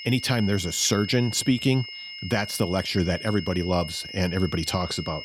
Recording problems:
high-pitched whine; noticeable; throughout; 3 kHz, 10 dB below the speech

